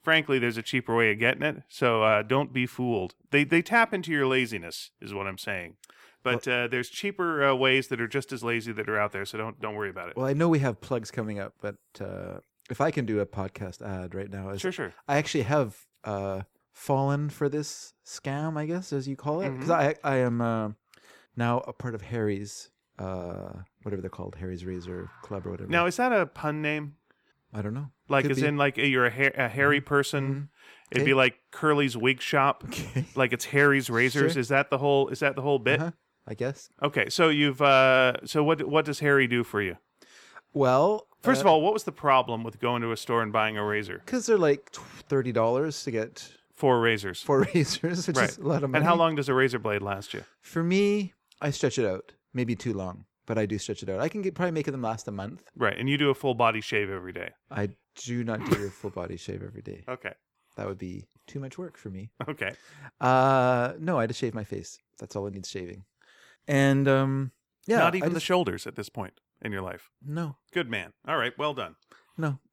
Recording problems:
none

